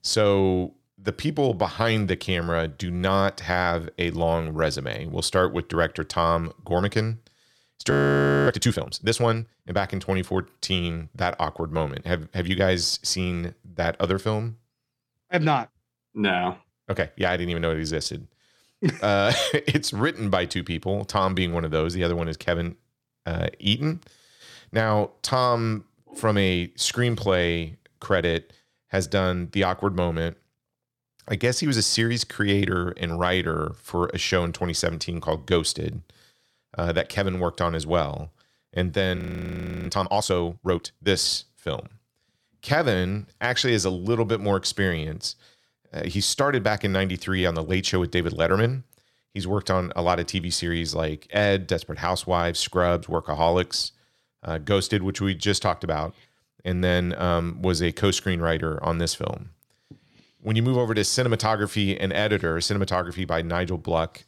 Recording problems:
audio freezing; at 8 s for 0.5 s and at 39 s for 0.5 s

